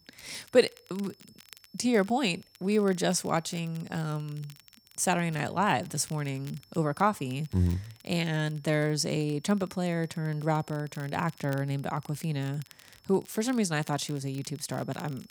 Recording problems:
high-pitched whine; faint; throughout; 5.5 kHz, 30 dB below the speech
crackle, like an old record; faint; 25 dB below the speech

